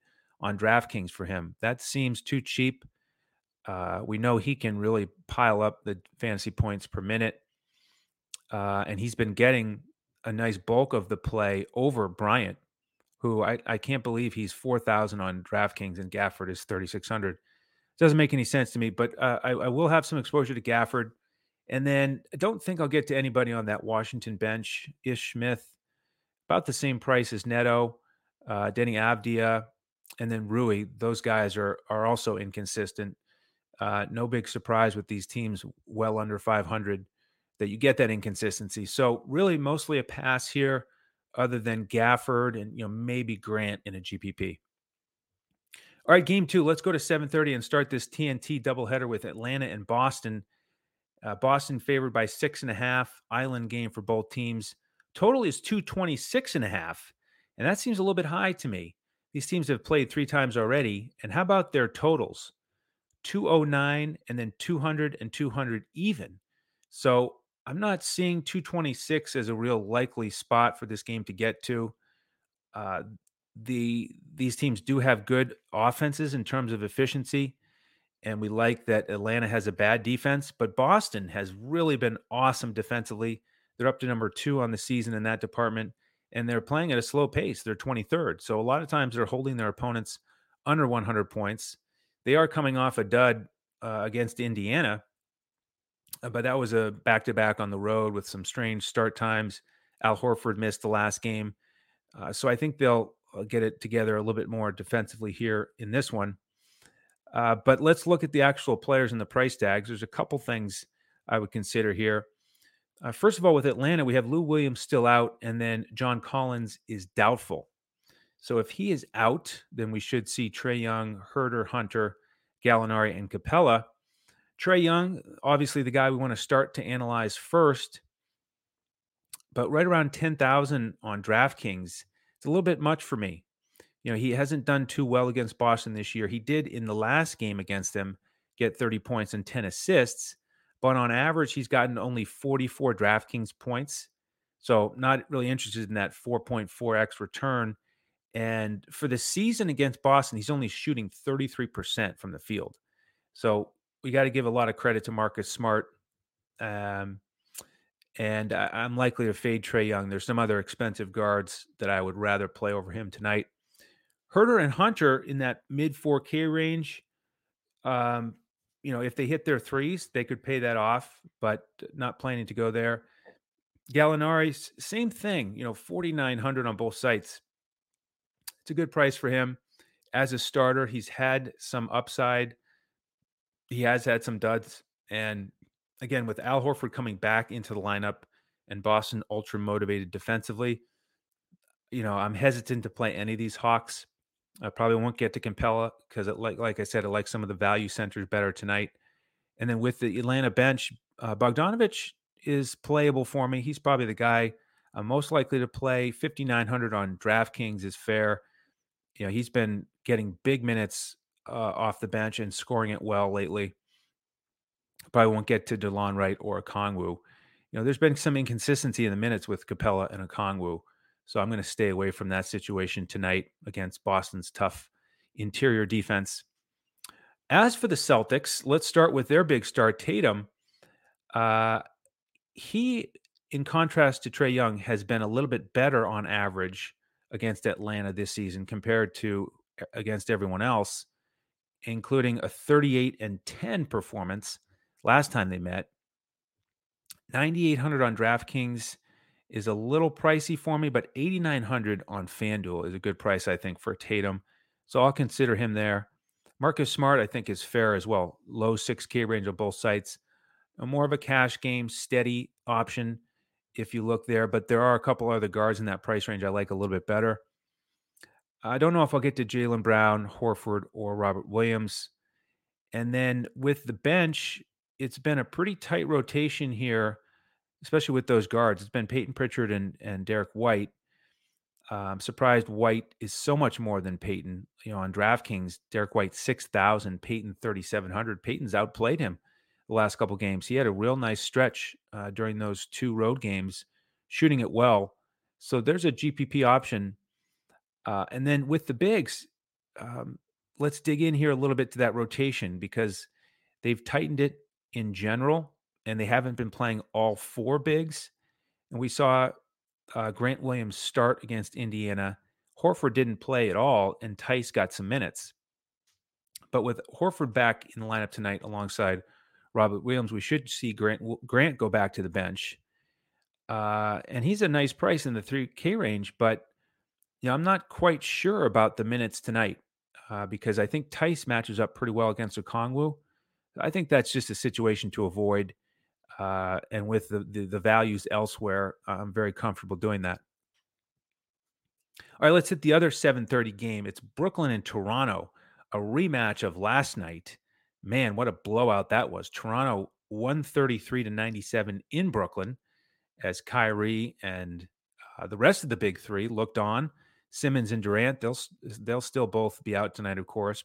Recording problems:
none

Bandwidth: 16 kHz